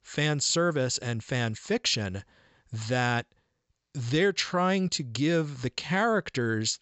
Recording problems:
high frequencies cut off; noticeable; nothing above 8 kHz

